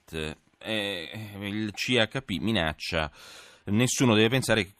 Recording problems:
none

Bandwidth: 14.5 kHz